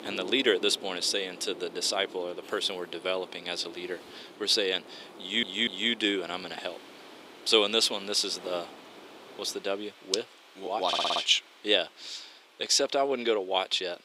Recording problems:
thin; somewhat; fading below 350 Hz
wind noise on the microphone; occasional gusts; until 9.5 s; 20 dB below the speech
rain or running water; faint; throughout; 25 dB below the speech
audio stuttering; at 5 s and at 11 s

